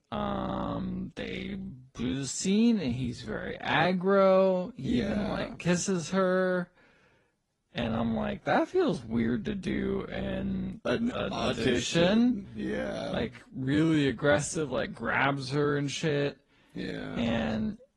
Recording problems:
wrong speed, natural pitch; too slow; 0.6 times normal speed
garbled, watery; slightly

